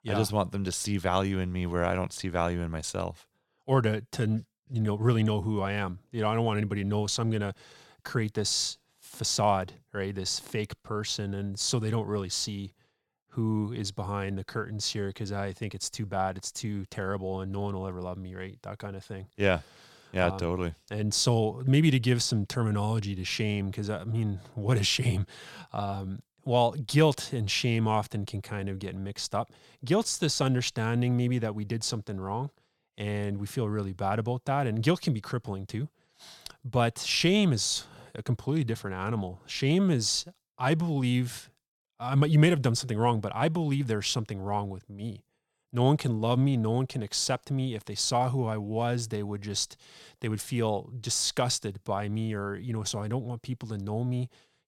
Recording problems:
none

